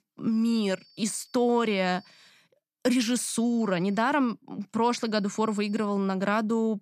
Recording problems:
high-pitched whine; faint; from 1 to 2.5 s, from 3 to 4 s and from 5 to 6 s; 4.5 kHz, 30 dB below the speech

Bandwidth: 15 kHz